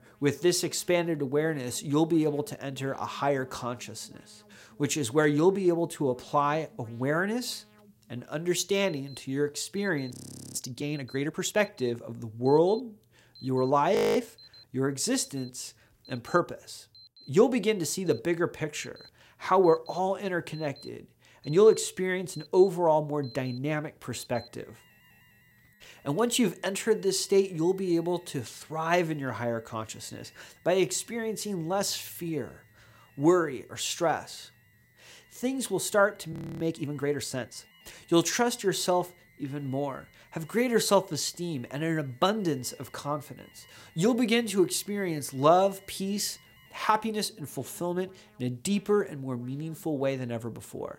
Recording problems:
alarms or sirens; faint; throughout; 25 dB below the speech
audio freezing; at 10 s, at 14 s and at 36 s

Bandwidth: 16 kHz